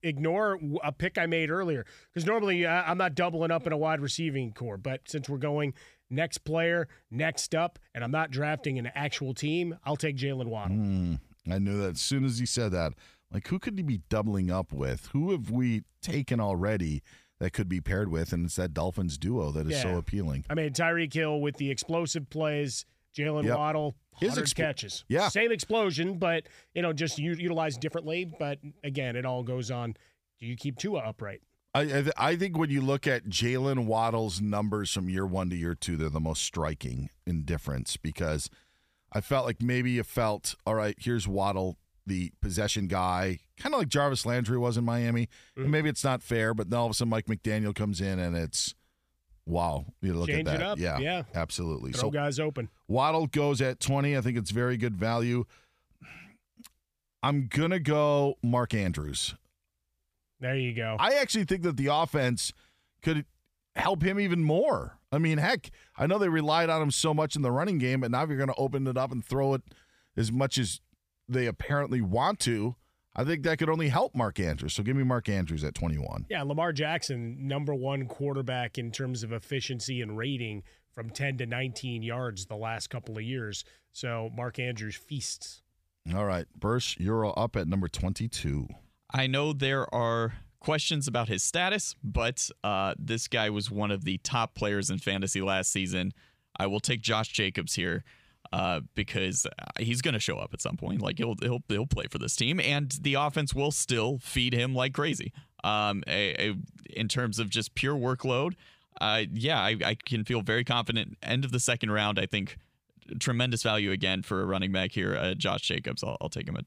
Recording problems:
uneven, jittery; strongly; from 27 s to 1:14

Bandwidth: 15 kHz